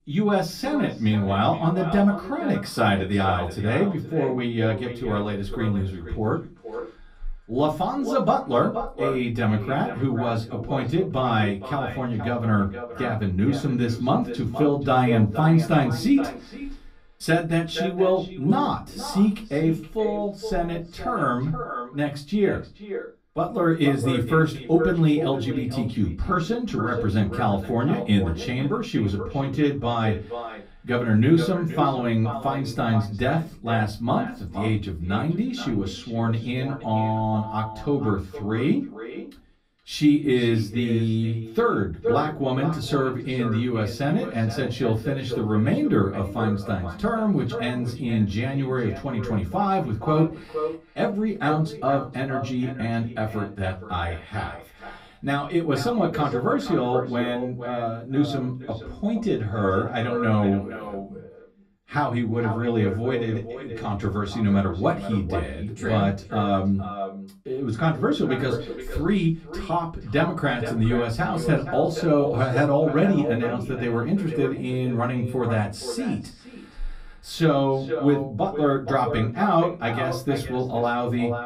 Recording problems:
echo of what is said; strong; throughout; 470 ms later, 10 dB below the speech
off-mic speech; far
room echo; very slight; dies away in 0.2 s

